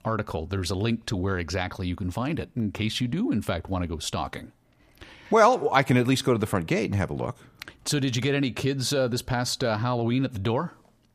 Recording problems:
none

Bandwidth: 15 kHz